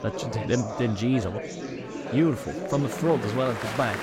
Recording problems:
chatter from many people; loud; throughout; 7 dB below the speech

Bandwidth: 16 kHz